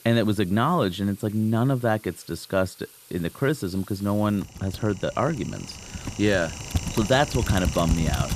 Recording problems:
household noises; loud; throughout; 7 dB below the speech

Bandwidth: 14.5 kHz